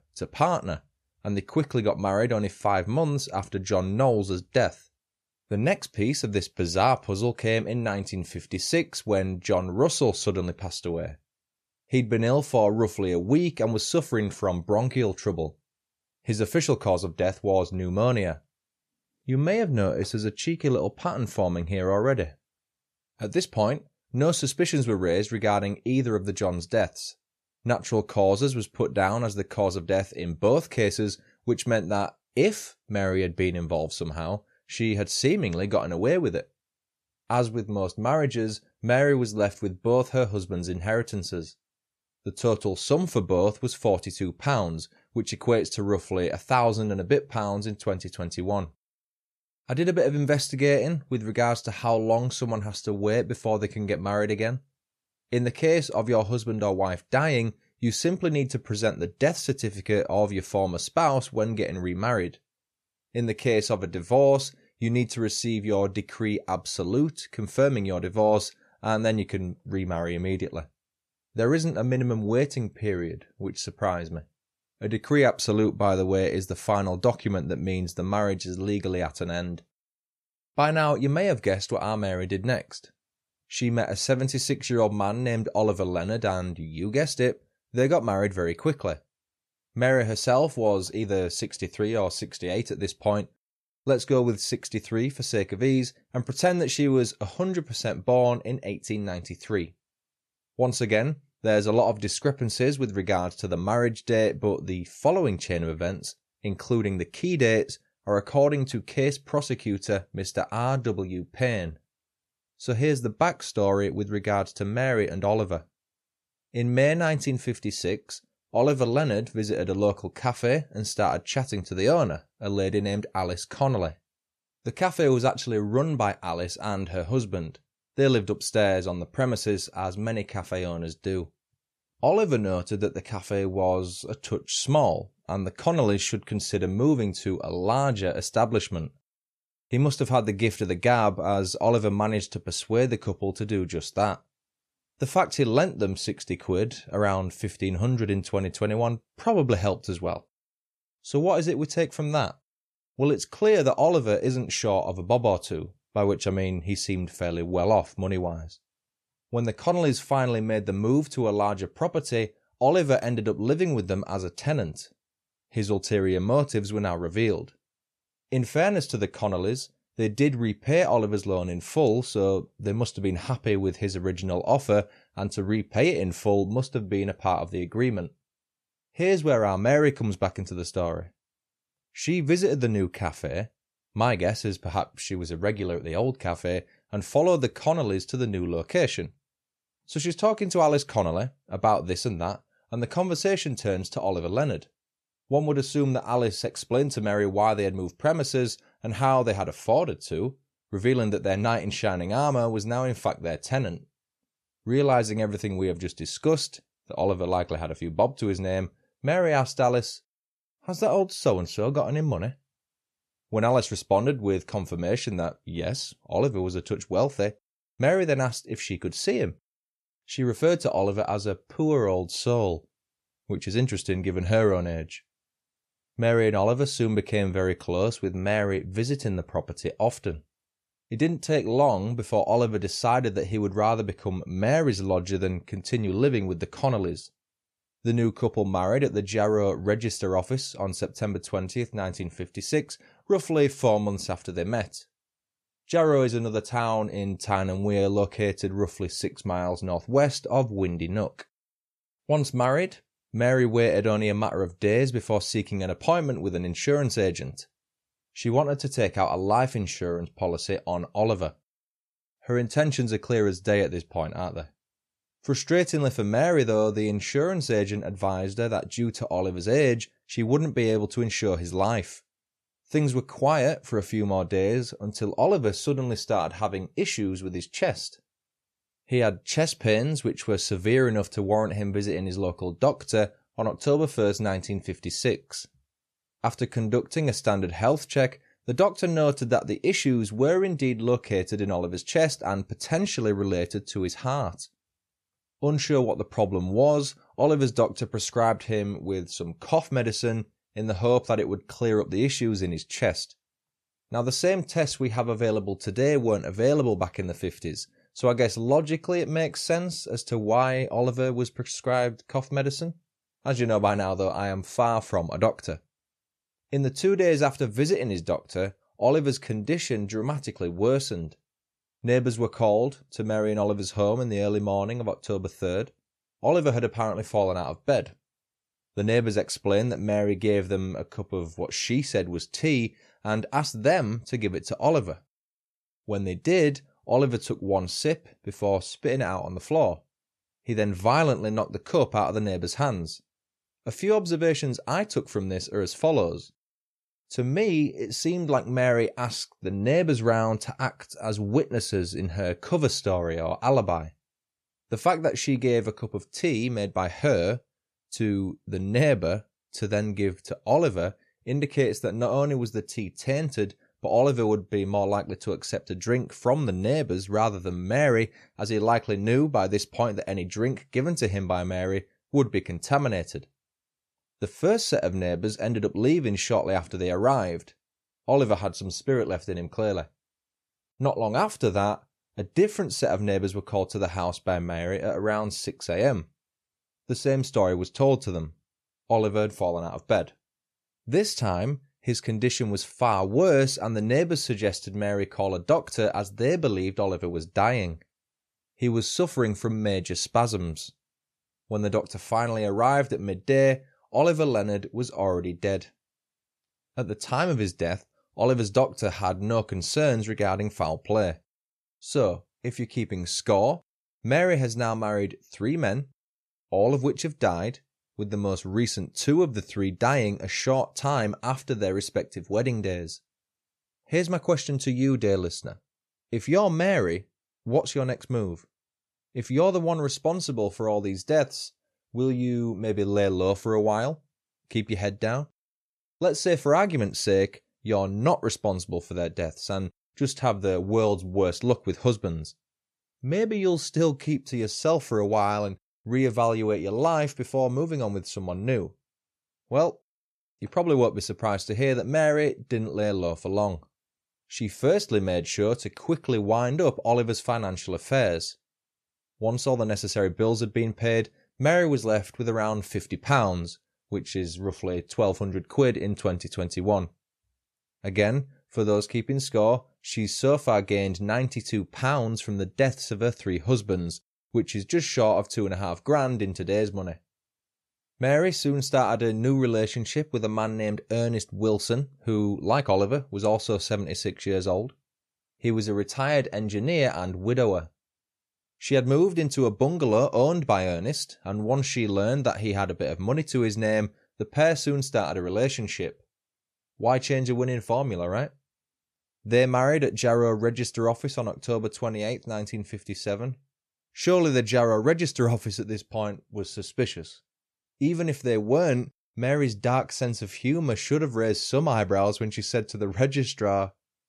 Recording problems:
none

